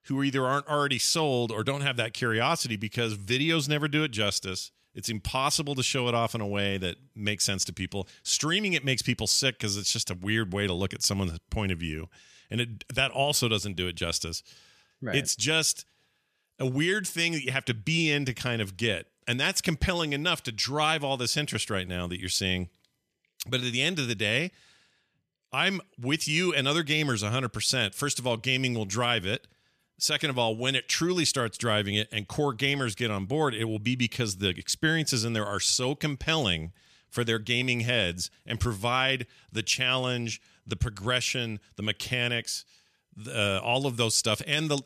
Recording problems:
none

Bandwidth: 14.5 kHz